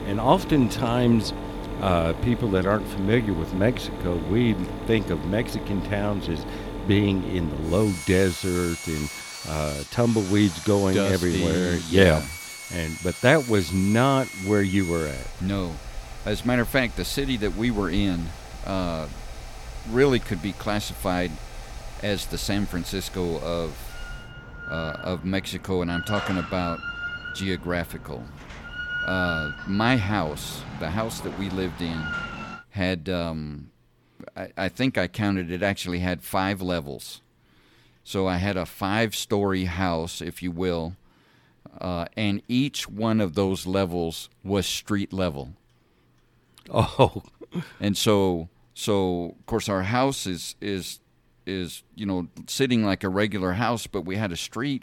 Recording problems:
machinery noise; loud; until 33 s; 10 dB below the speech

